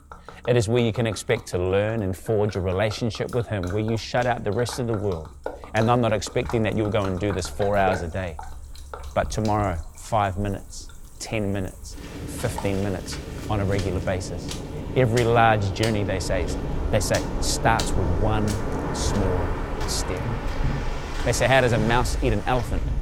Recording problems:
rain or running water; loud; throughout; 7 dB below the speech

